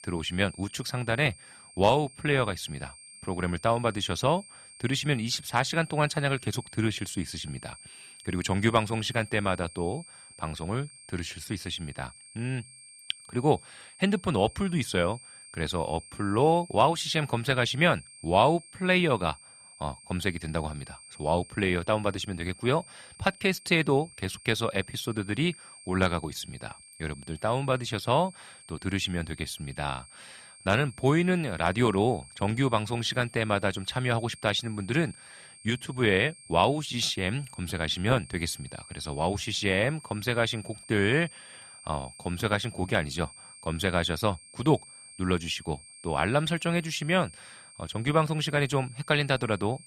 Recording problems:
high-pitched whine; noticeable; throughout; 8.5 kHz, 20 dB below the speech

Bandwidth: 14 kHz